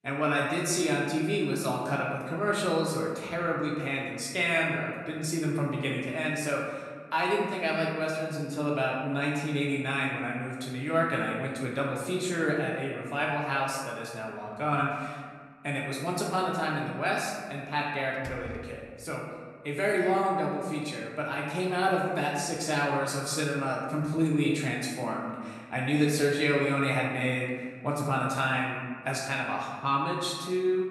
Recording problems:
off-mic speech; far
room echo; noticeable; dies away in 1.4 s
door banging; faint; at 18 s; peak 15 dB below the speech

